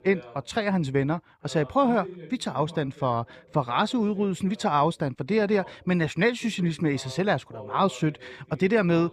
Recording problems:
voice in the background; faint; throughout; 20 dB below the speech

